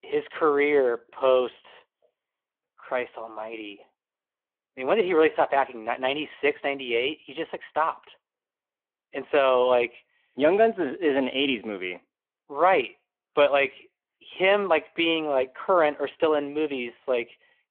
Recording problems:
phone-call audio

